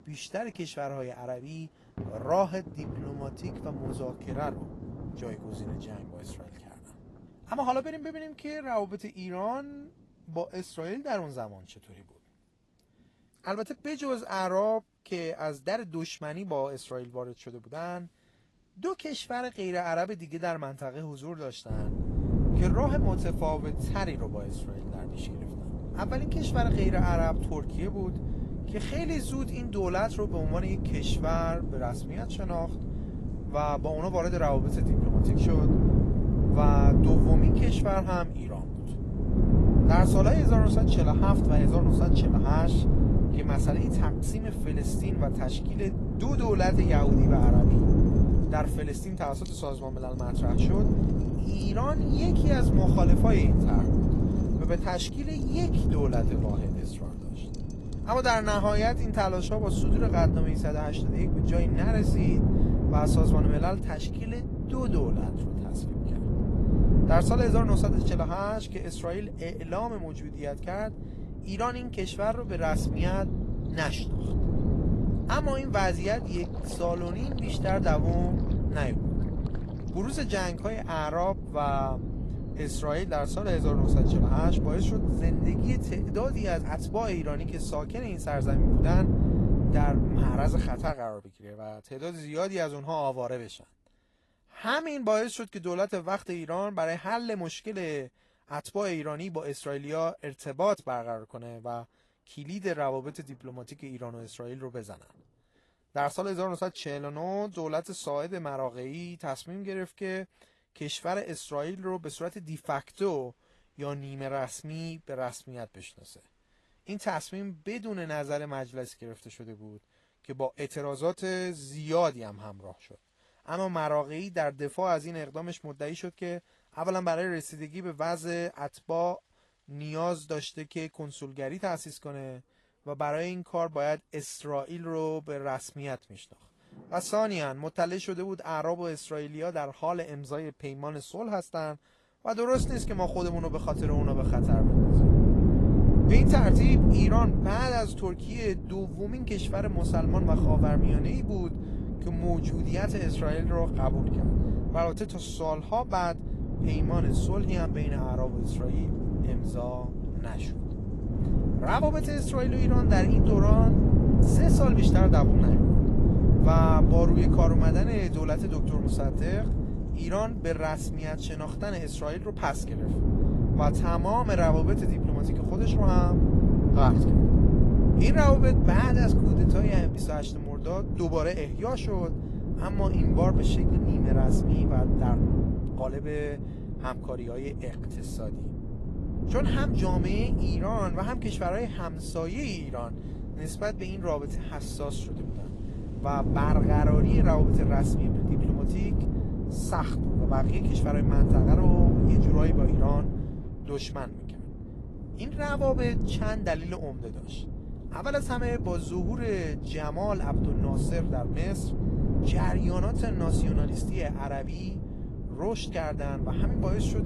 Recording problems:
garbled, watery; slightly; nothing above 11.5 kHz
wind noise on the microphone; heavy; from 22 s to 1:31 and from 2:23 on; 3 dB below the speech
rain or running water; noticeable; throughout; 15 dB below the speech

